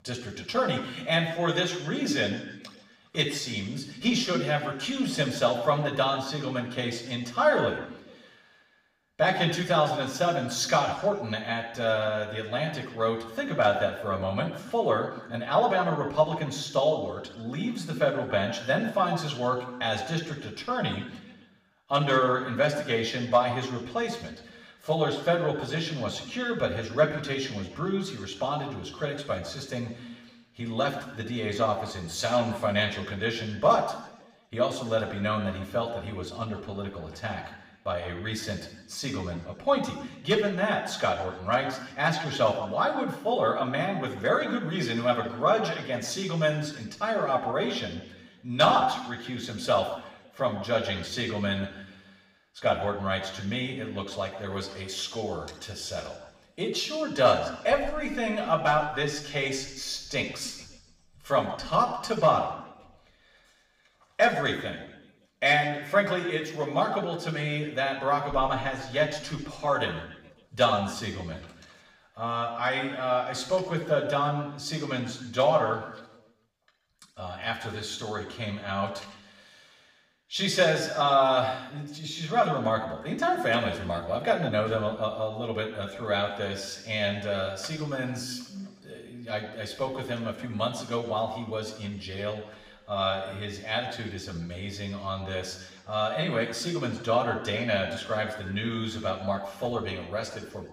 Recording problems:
room echo; slight; dies away in 1 s
off-mic speech; somewhat distant

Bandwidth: 15.5 kHz